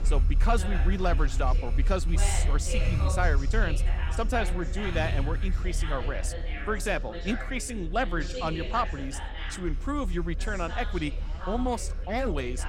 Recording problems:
traffic noise; very loud; throughout; 1 dB above the speech
background chatter; loud; throughout; 4 voices, 8 dB below the speech

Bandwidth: 17 kHz